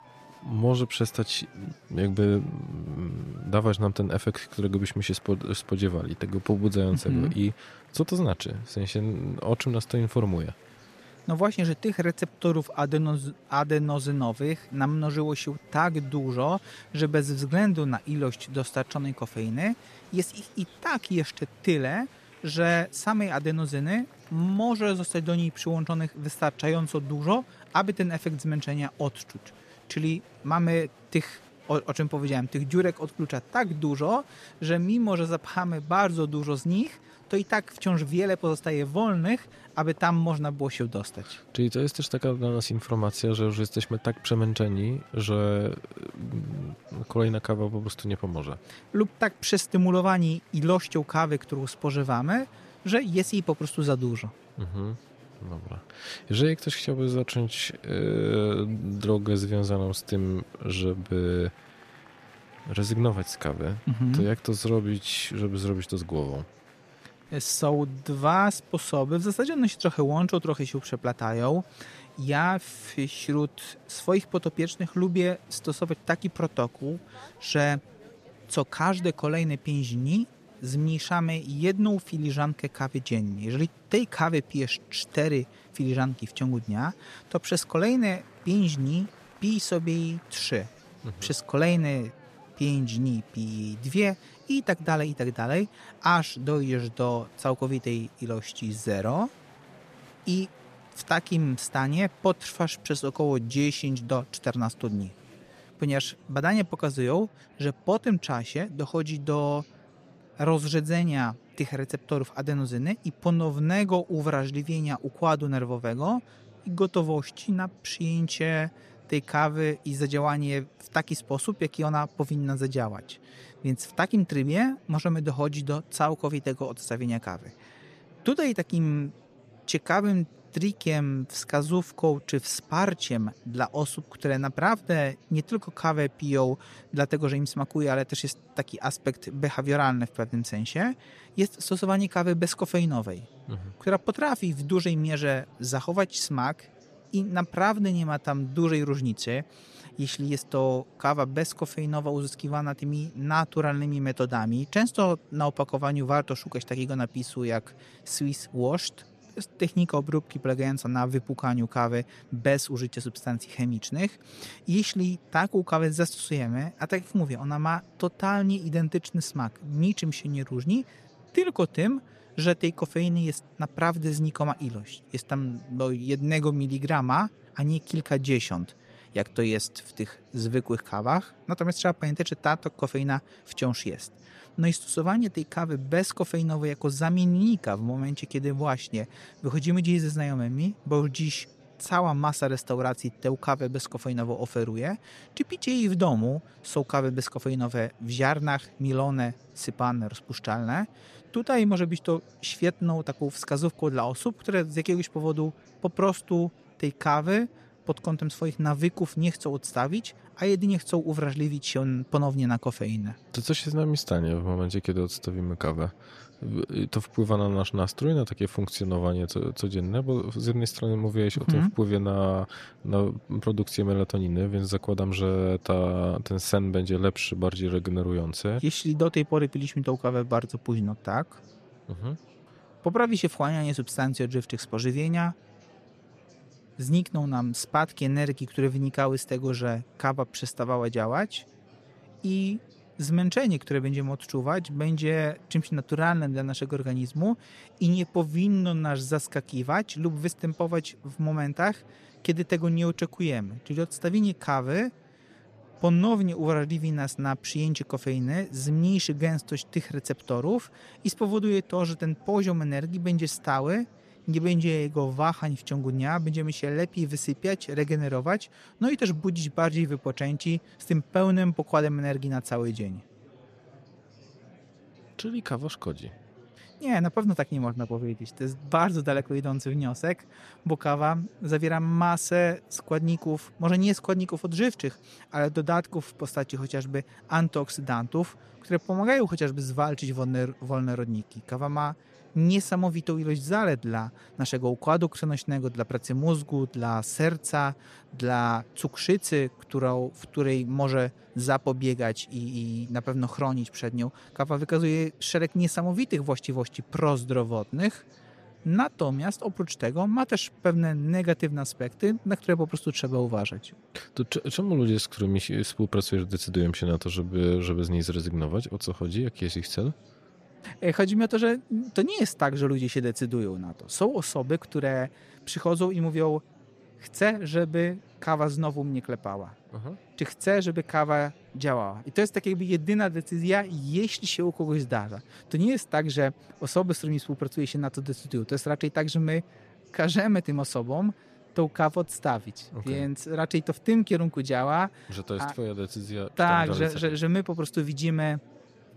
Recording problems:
murmuring crowd; faint; throughout; 25 dB below the speech

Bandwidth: 14.5 kHz